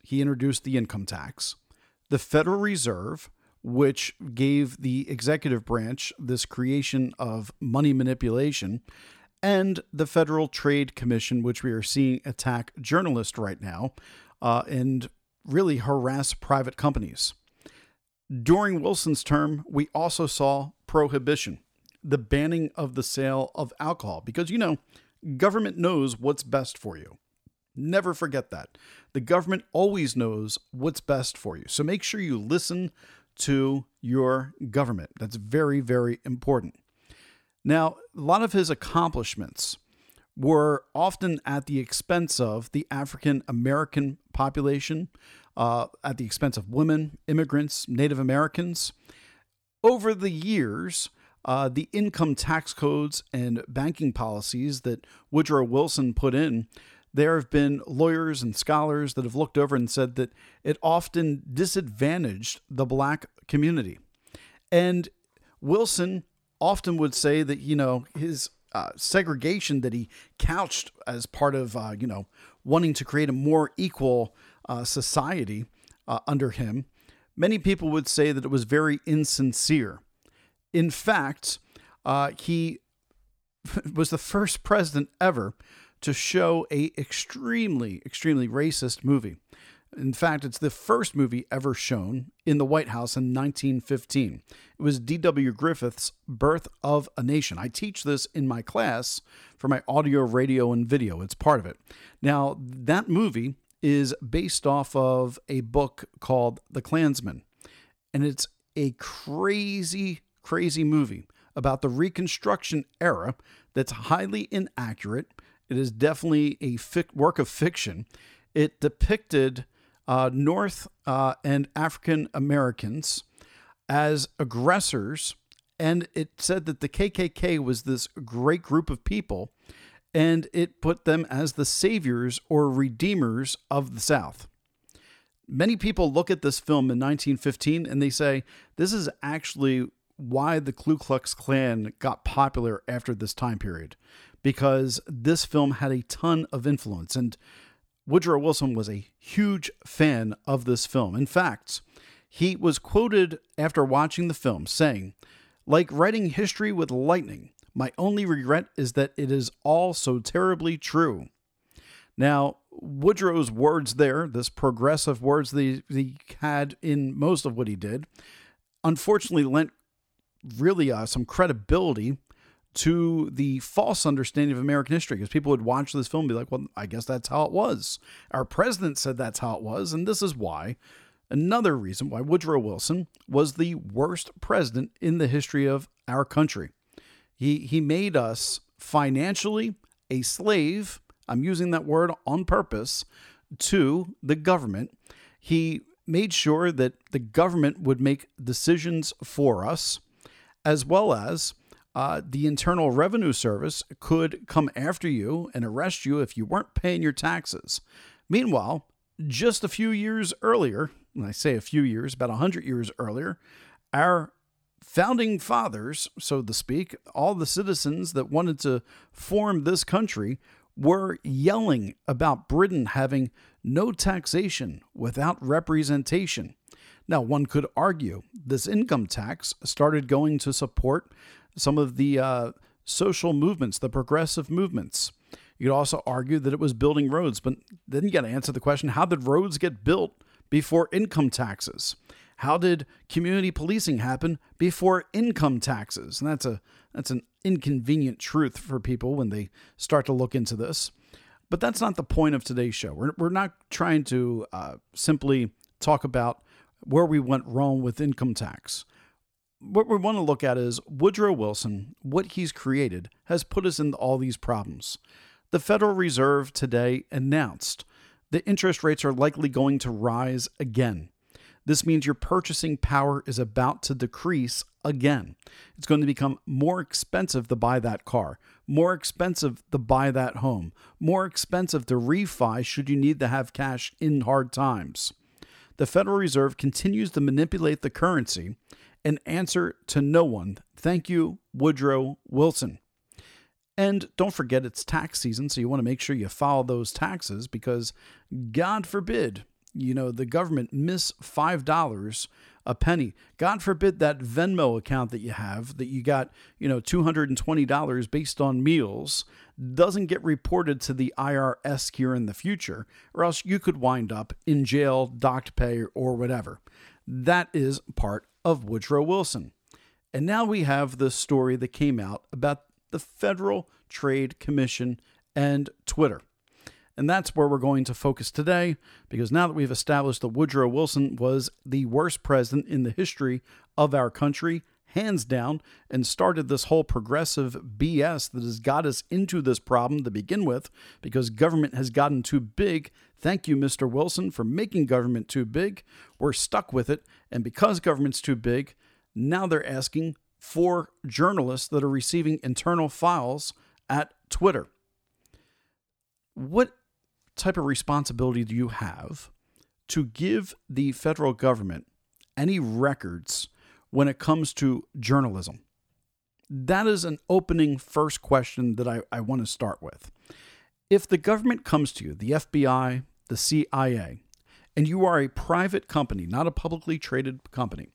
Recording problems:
none

